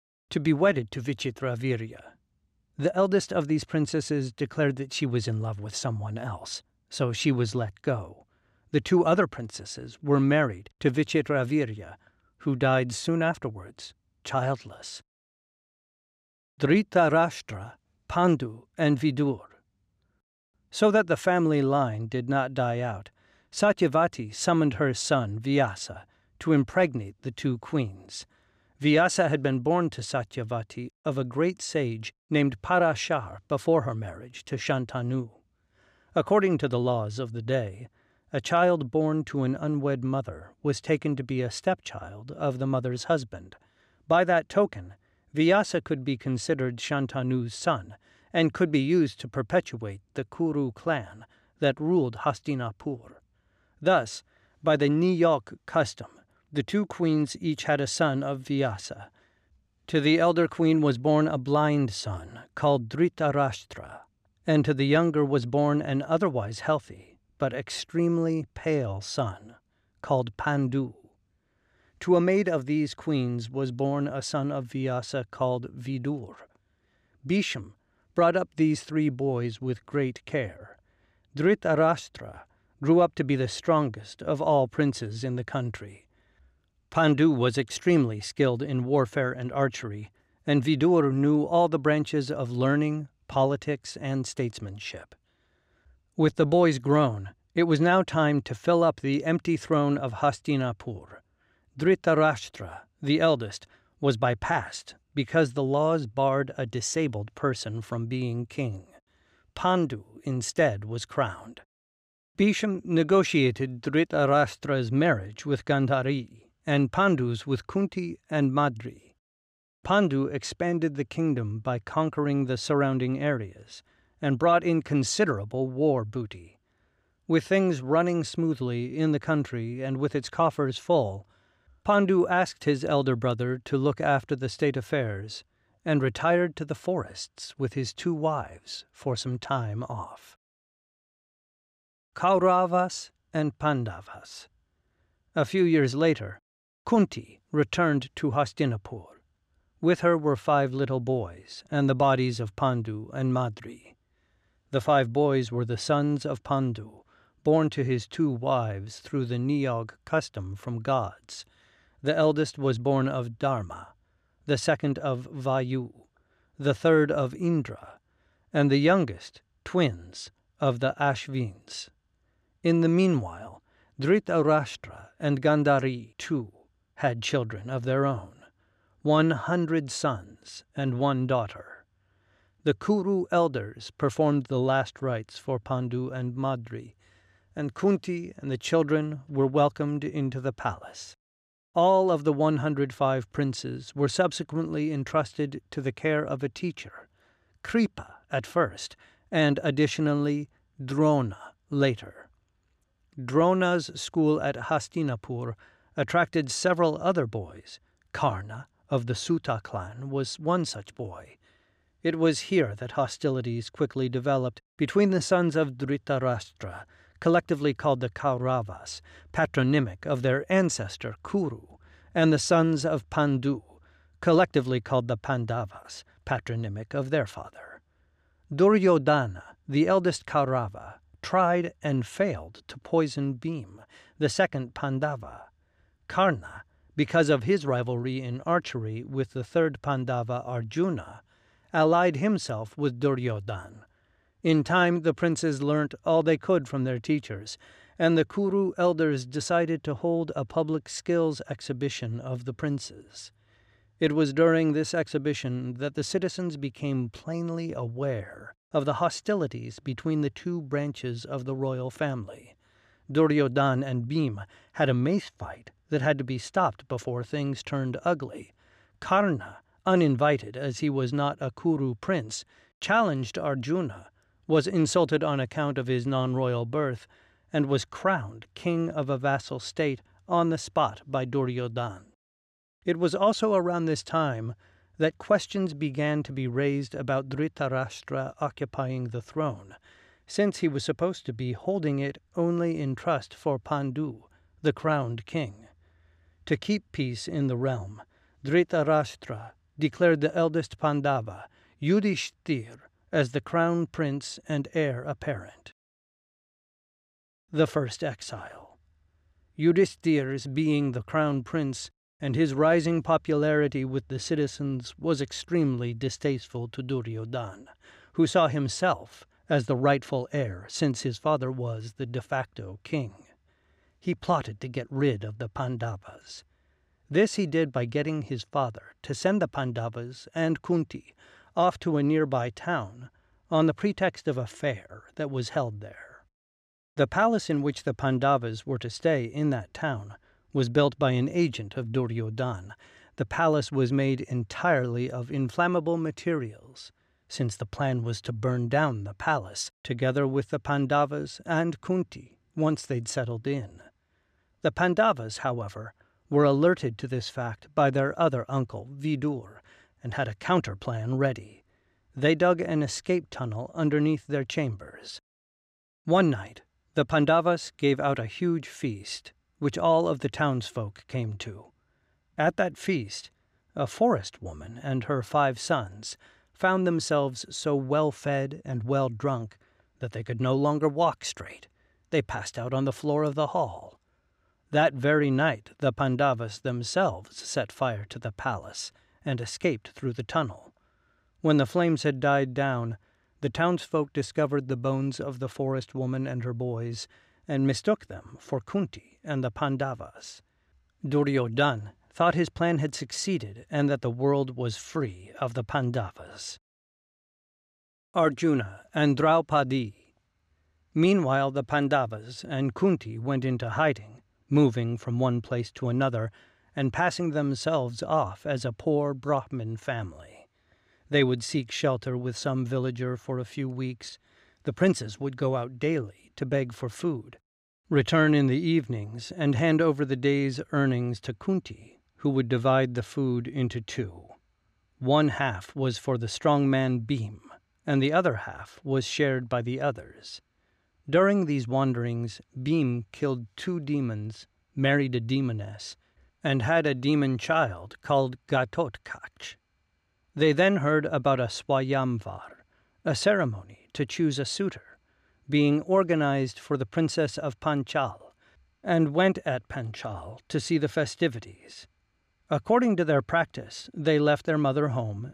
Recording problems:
none

